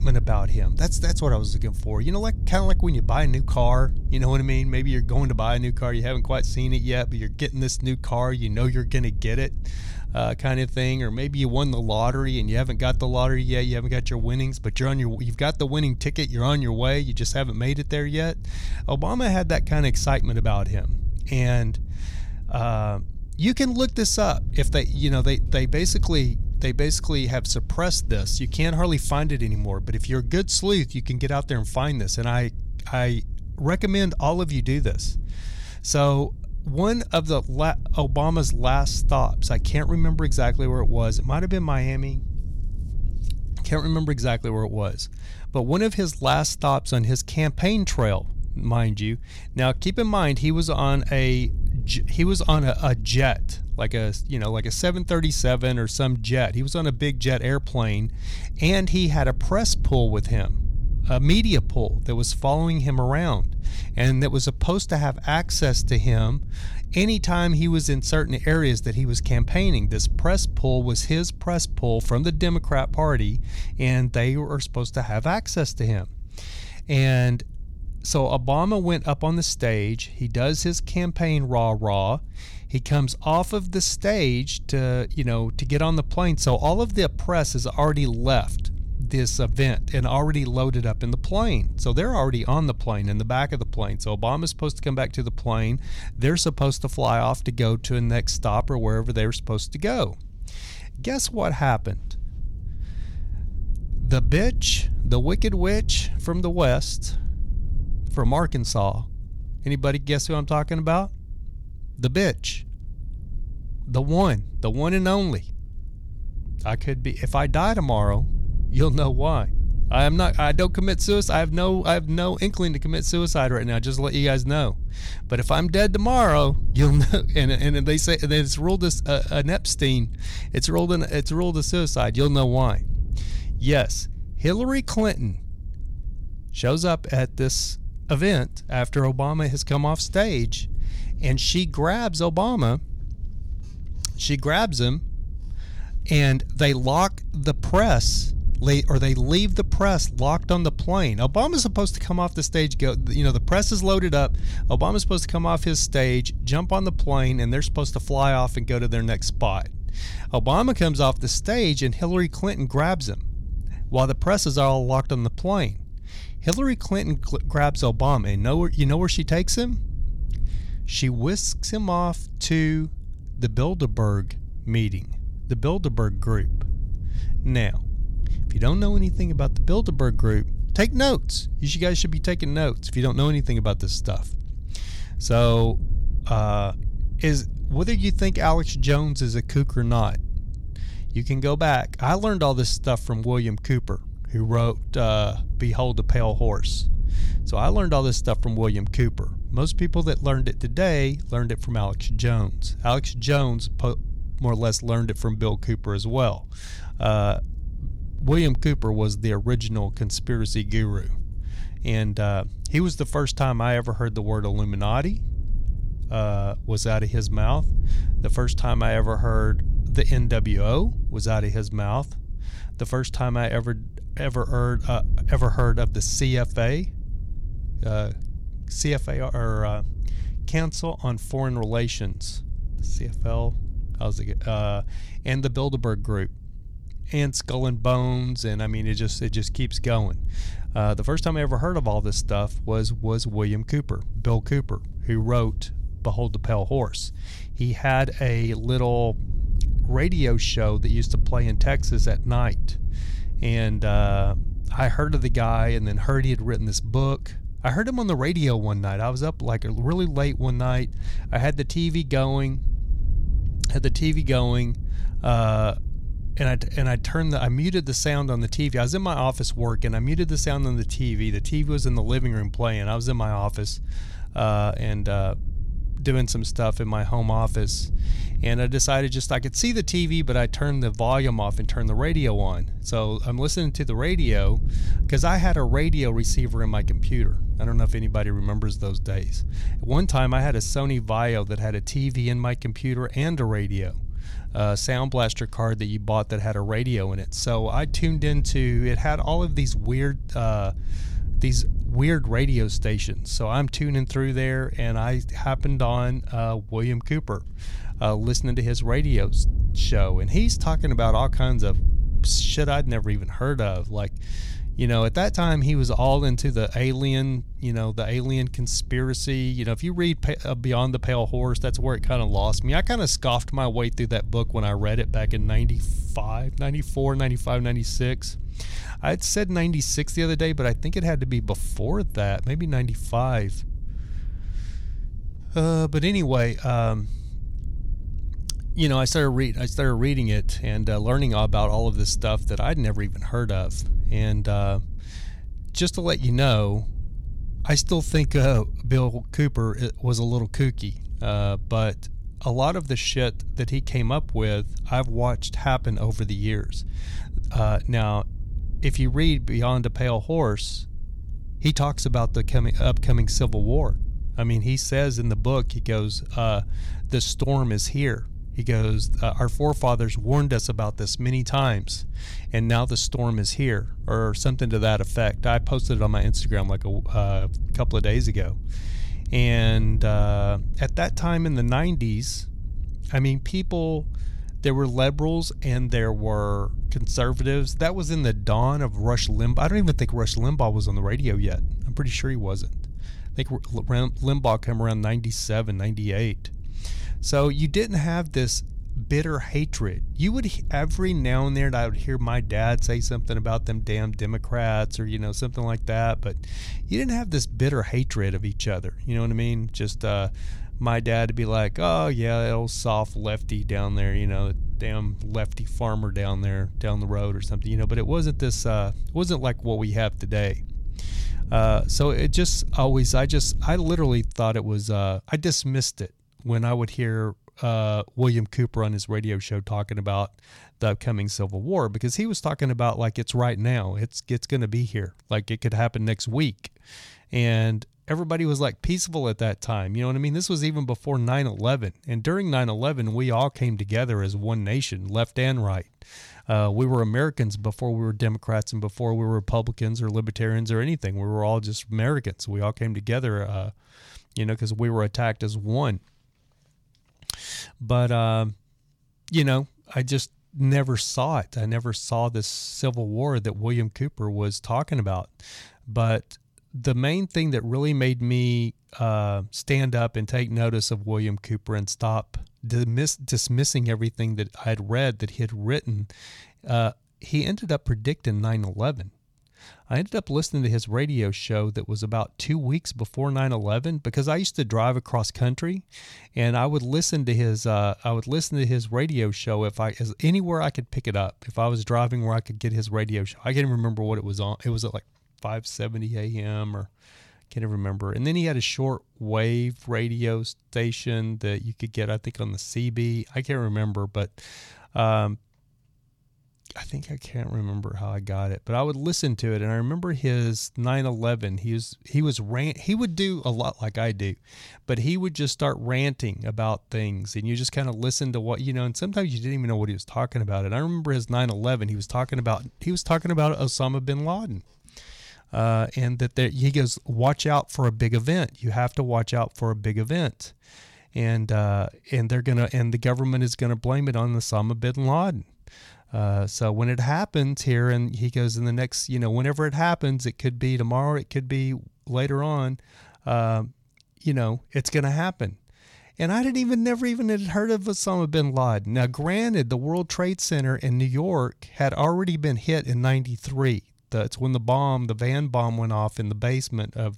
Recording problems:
wind noise on the microphone; occasional gusts; until 7:04; 20 dB below the speech

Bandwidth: 18 kHz